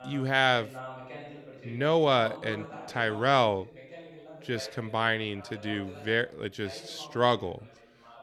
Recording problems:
voice in the background; noticeable; throughout; 15 dB below the speech

